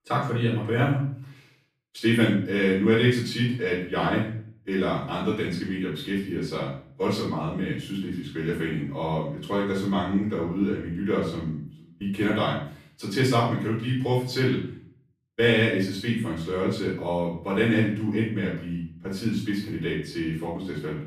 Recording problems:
off-mic speech; far
room echo; noticeable; dies away in 0.5 s

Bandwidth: 14.5 kHz